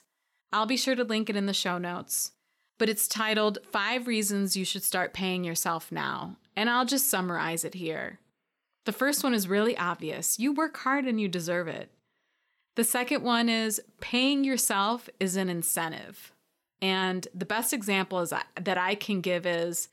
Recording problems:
none

